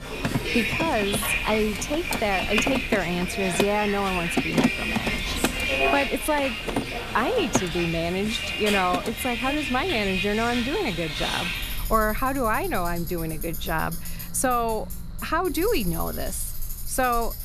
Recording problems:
machinery noise; loud; throughout; 5 dB below the speech
traffic noise; loud; throughout; 2 dB below the speech

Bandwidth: 14.5 kHz